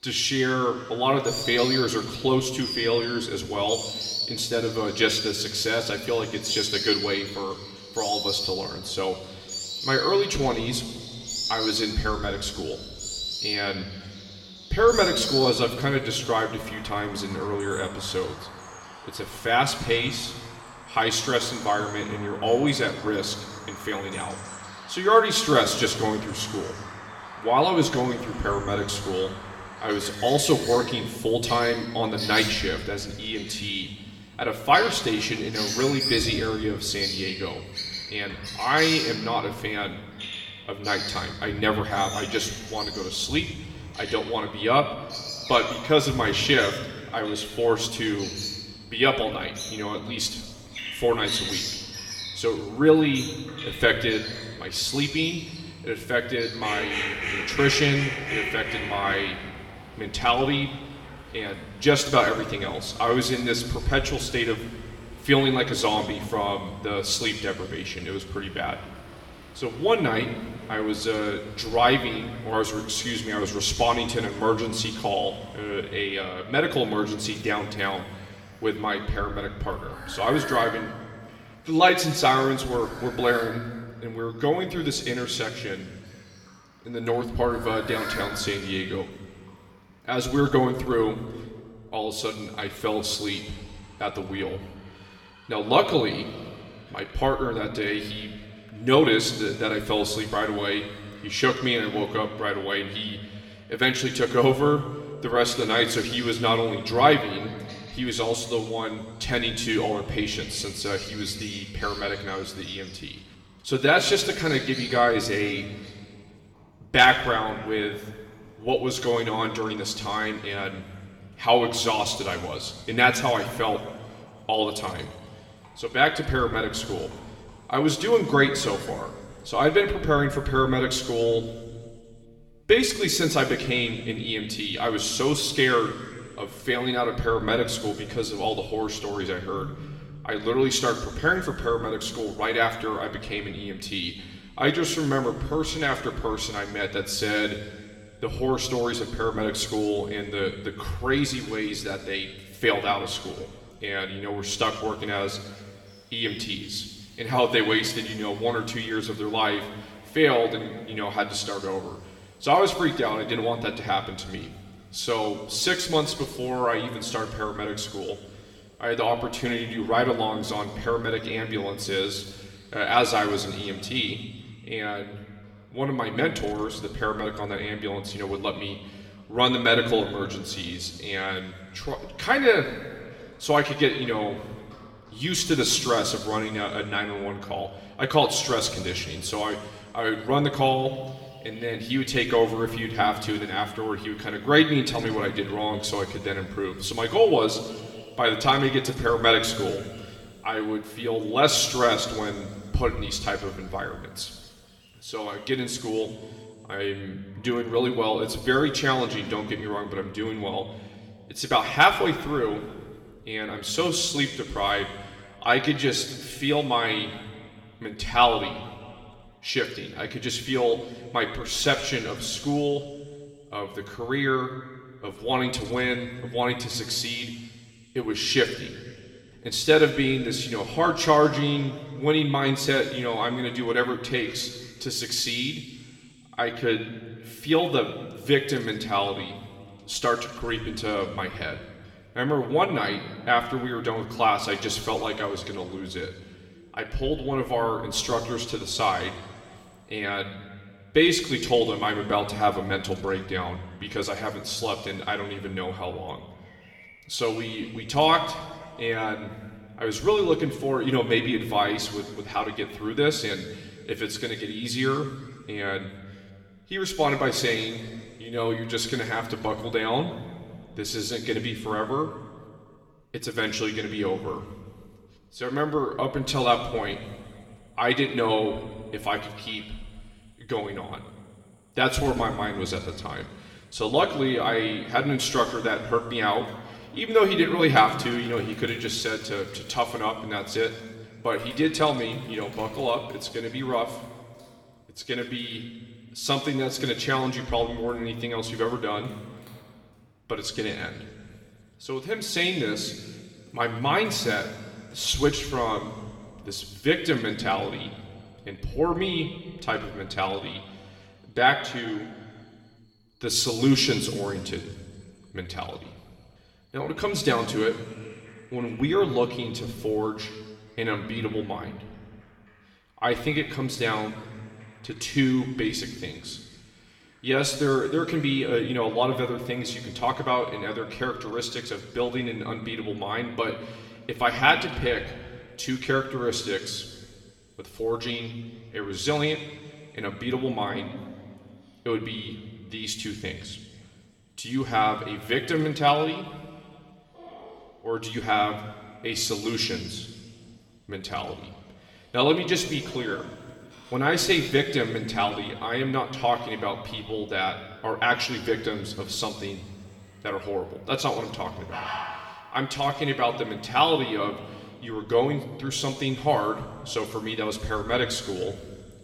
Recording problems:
room echo; slight; dies away in 1.6 s
off-mic speech; somewhat distant
animal sounds; loud; throughout; 10 dB below the speech

